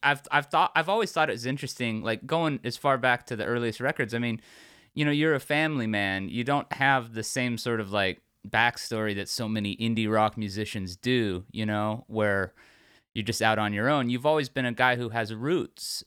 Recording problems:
none

